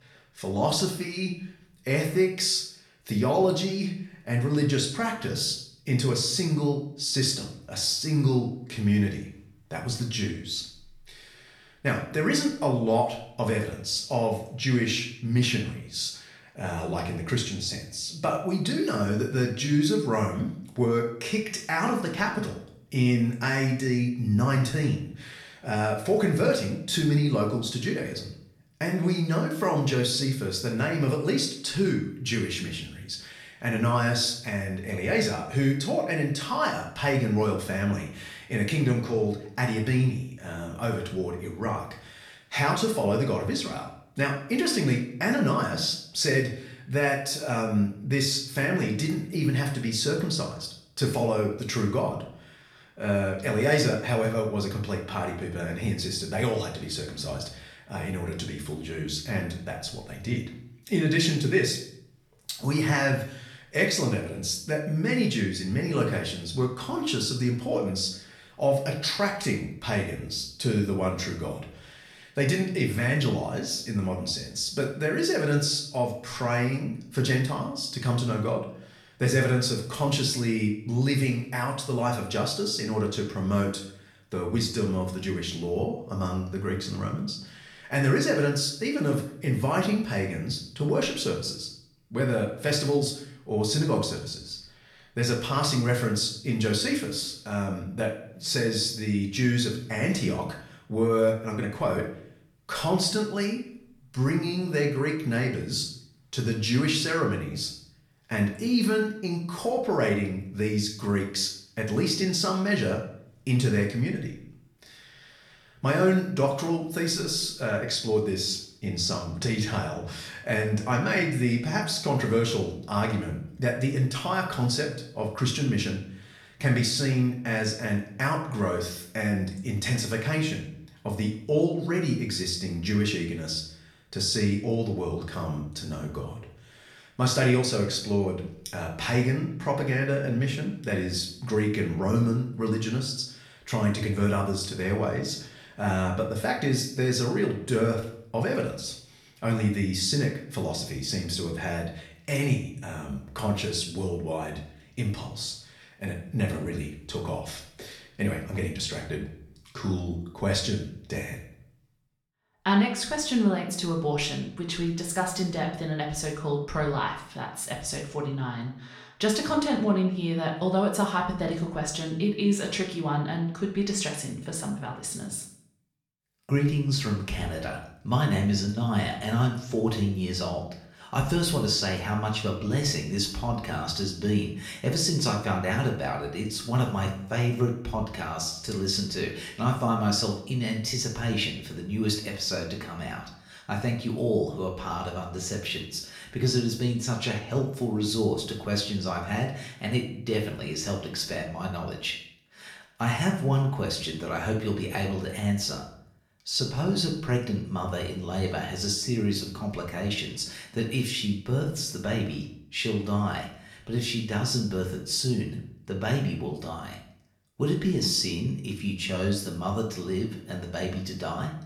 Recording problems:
off-mic speech; far
room echo; slight; dies away in 0.5 s

